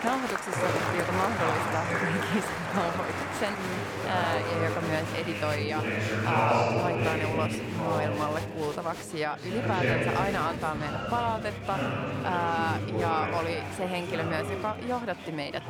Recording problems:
chatter from many people; very loud; throughout; 1 dB above the speech

